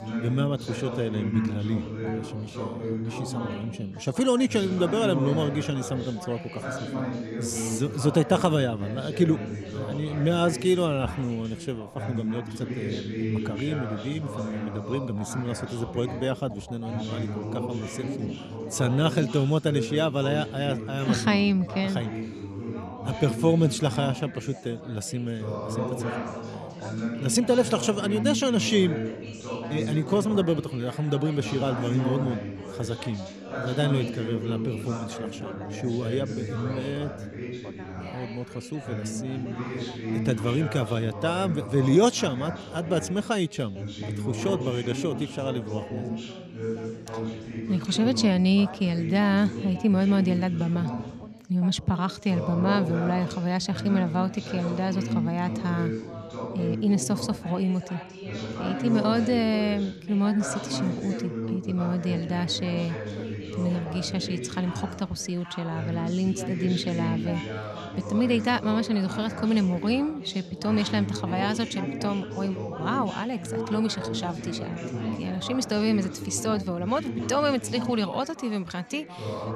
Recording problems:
background chatter; loud; throughout; 3 voices, 7 dB below the speech

